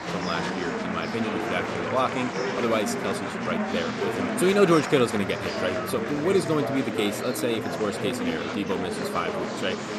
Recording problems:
murmuring crowd; loud; throughout; 2 dB below the speech

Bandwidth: 13.5 kHz